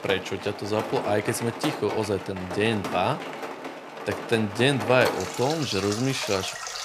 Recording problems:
rain or running water; loud; throughout; 7 dB below the speech

